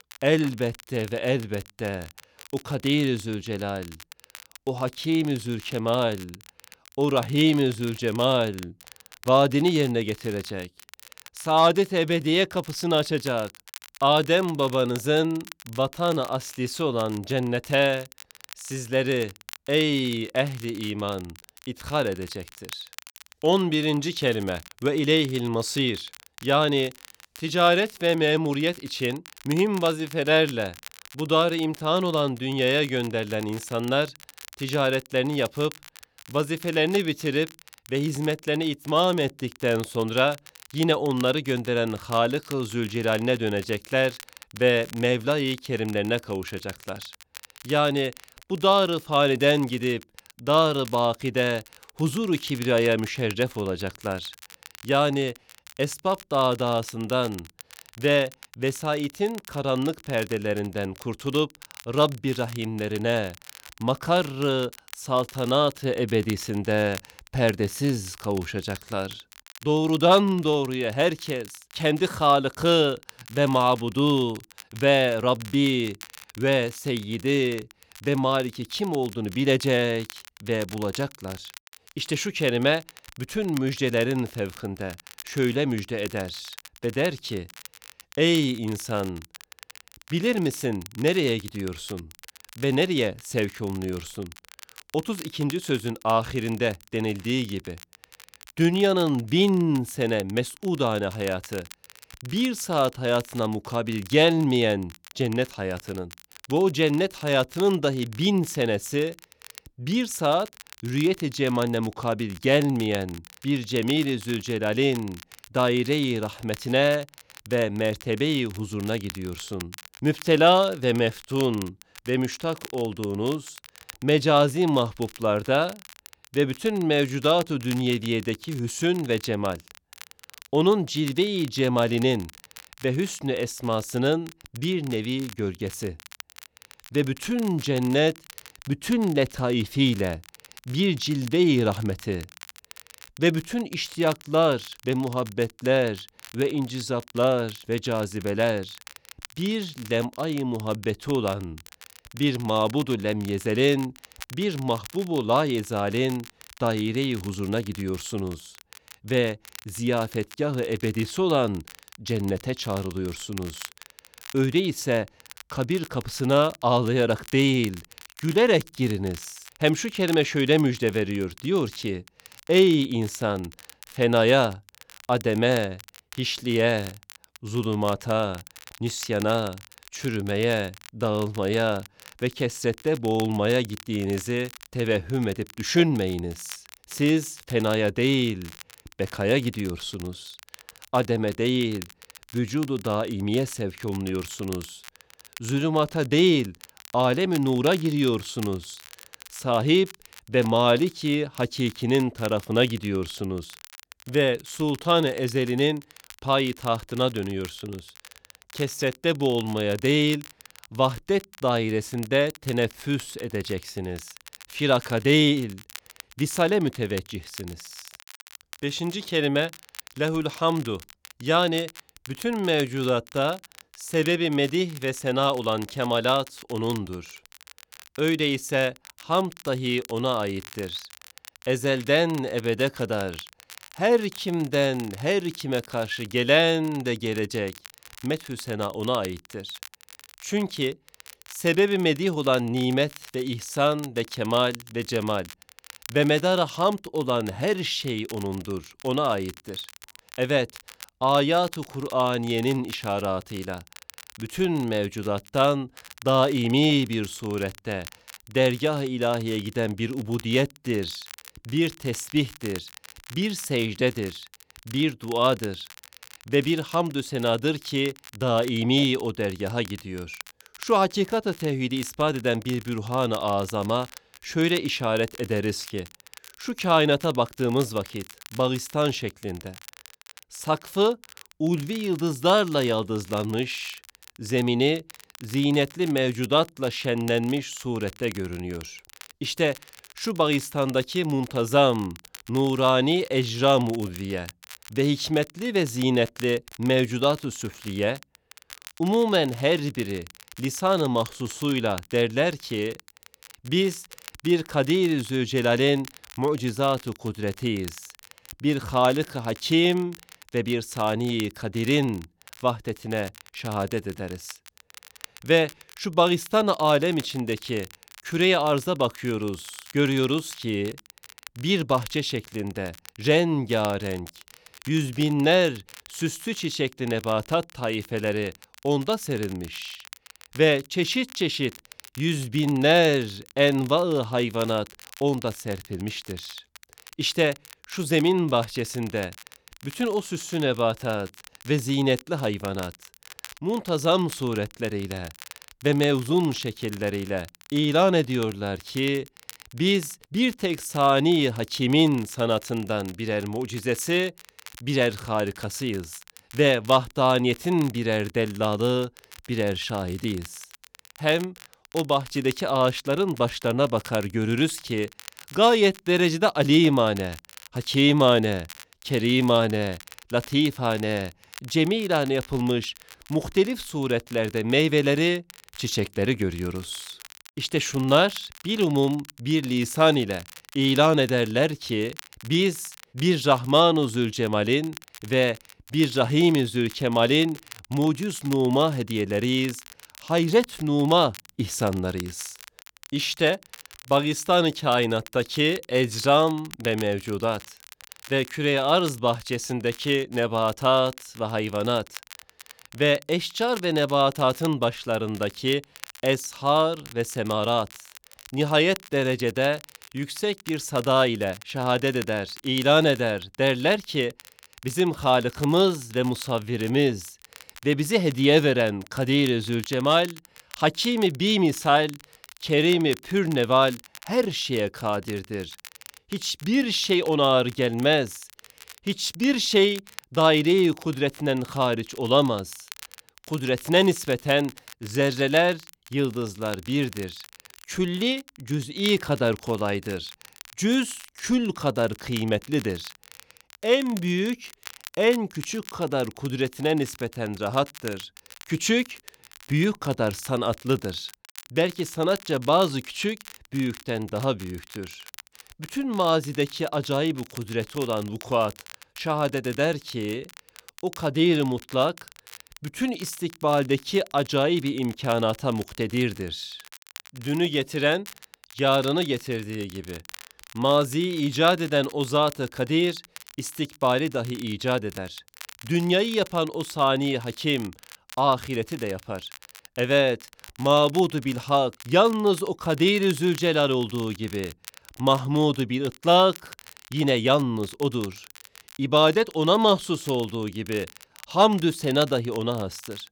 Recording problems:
crackle, like an old record; faint; 20 dB below the speech

